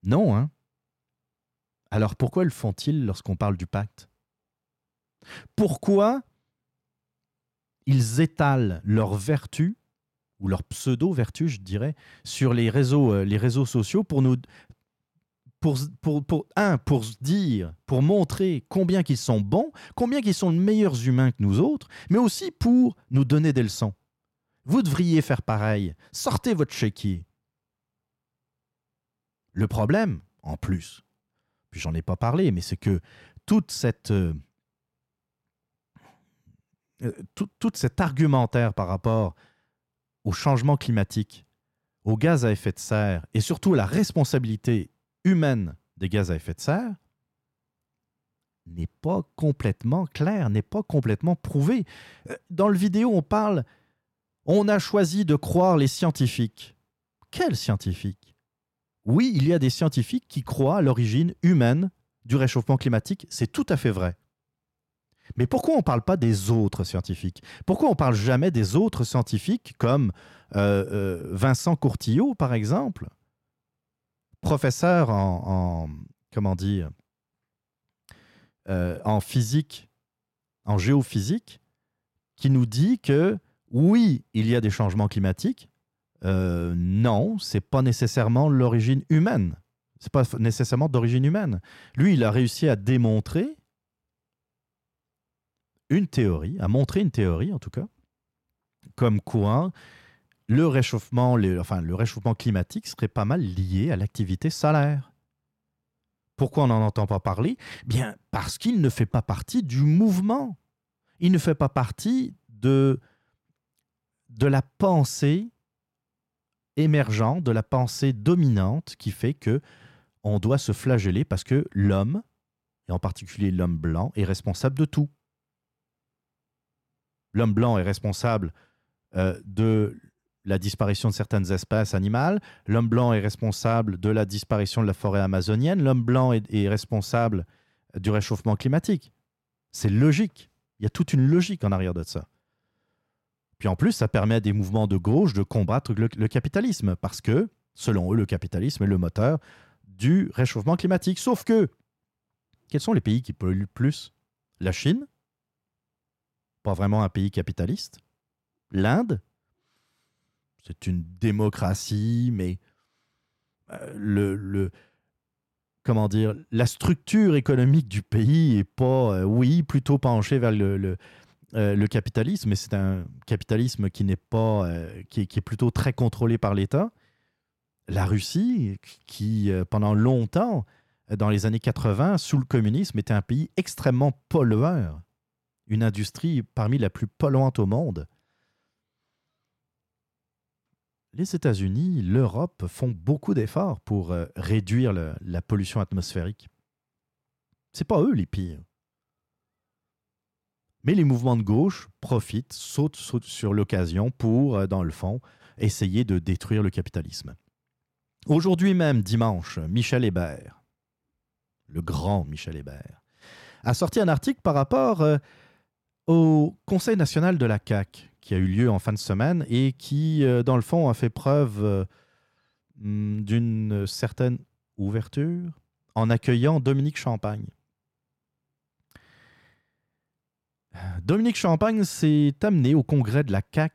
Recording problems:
none

